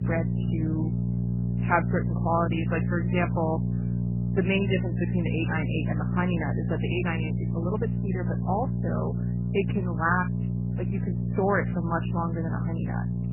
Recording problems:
garbled, watery; badly; nothing above 3 kHz
electrical hum; loud; throughout; 60 Hz, 9 dB below the speech

